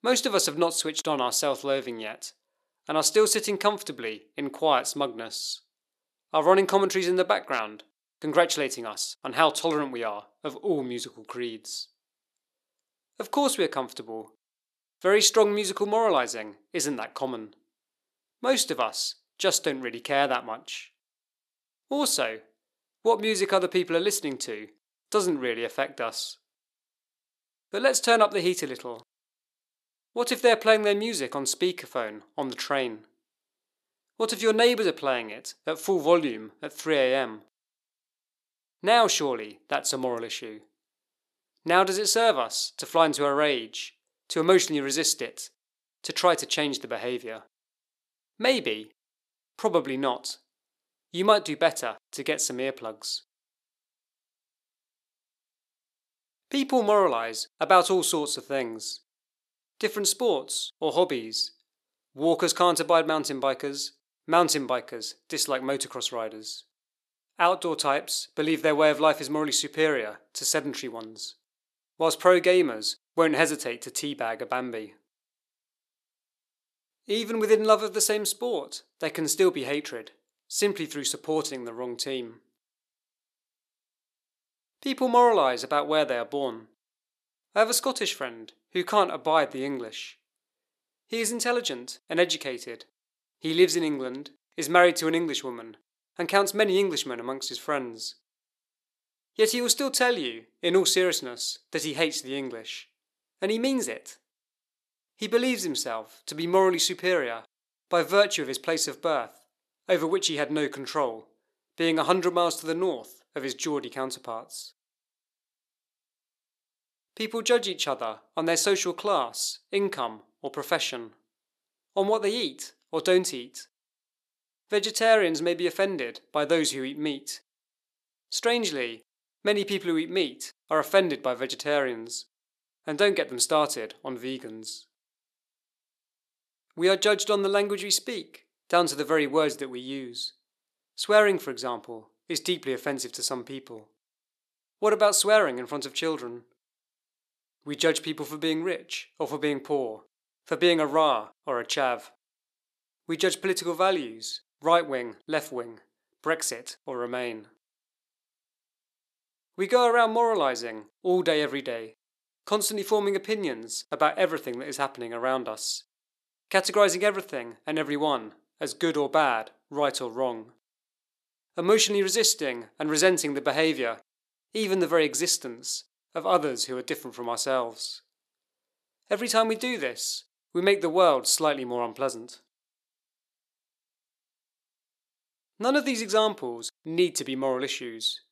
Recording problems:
thin; somewhat; fading below 400 Hz

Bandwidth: 13.5 kHz